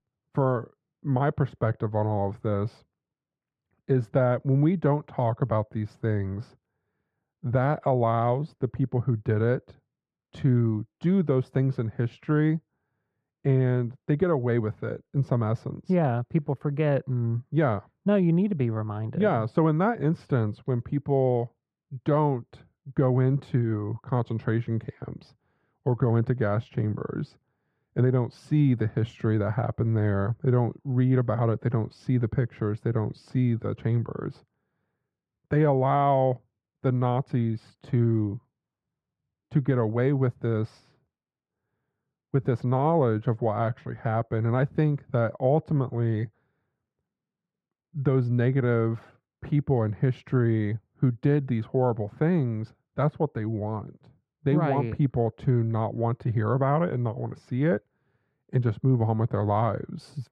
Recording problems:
muffled; very; fading above 3.5 kHz

